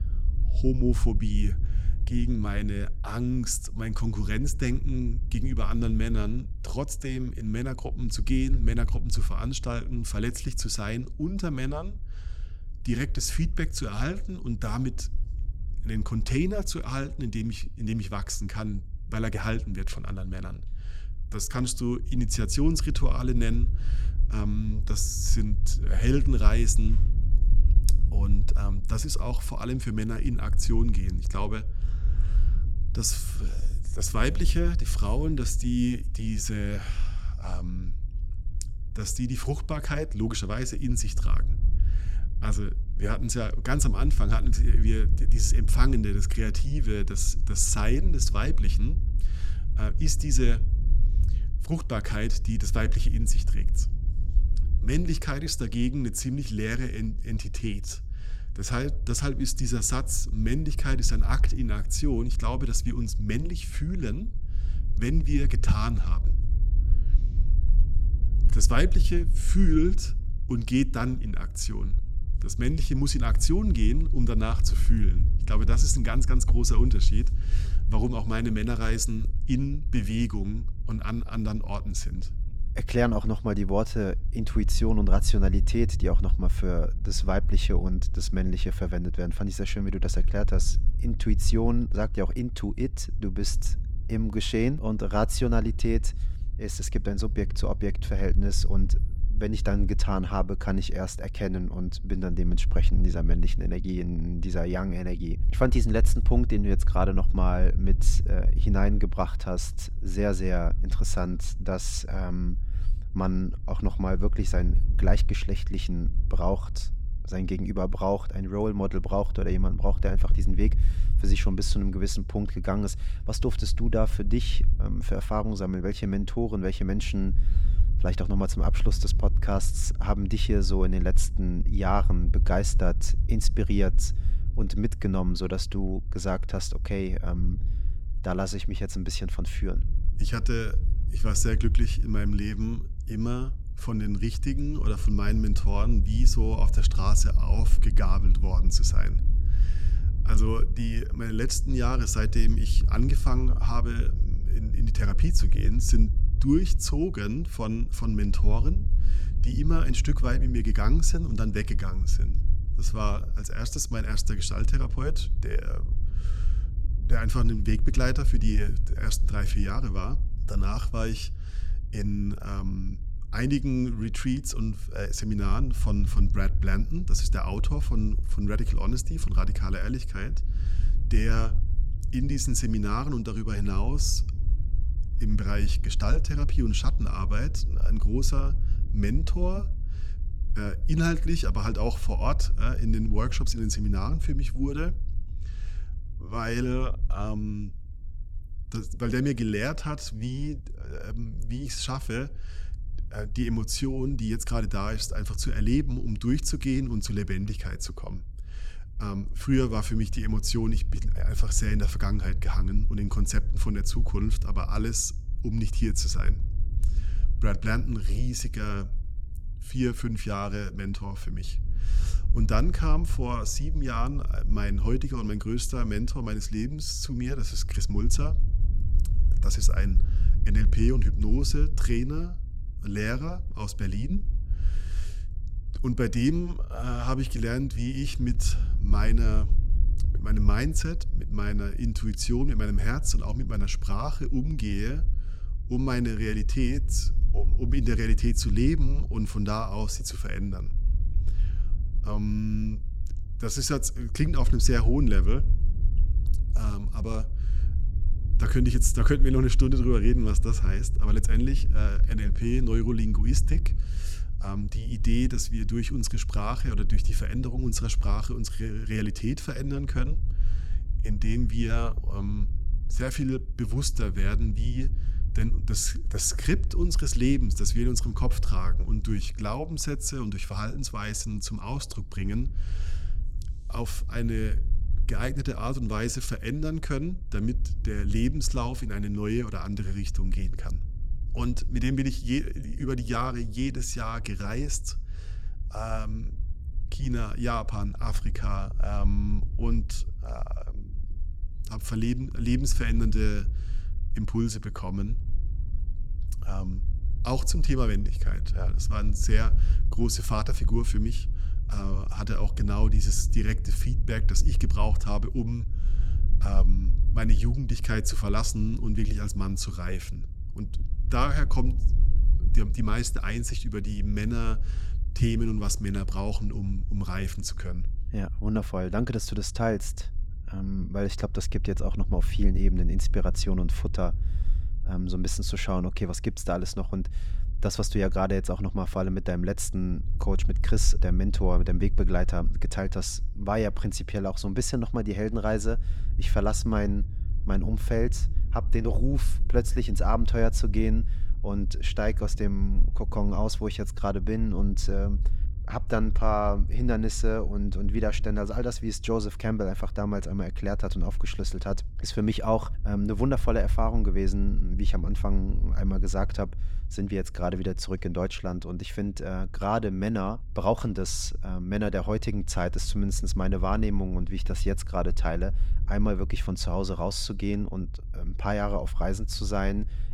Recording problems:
low rumble; noticeable; throughout; 15 dB below the speech

